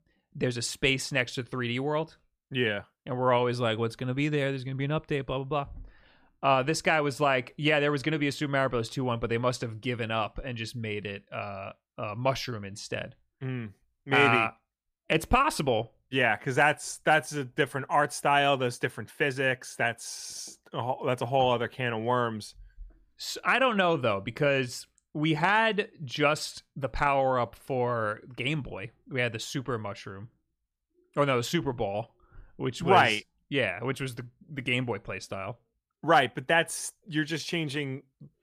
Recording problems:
none

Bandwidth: 15 kHz